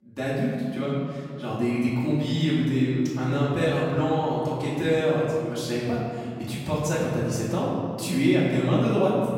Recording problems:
room echo; strong; dies away in 2.3 s
off-mic speech; far

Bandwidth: 16 kHz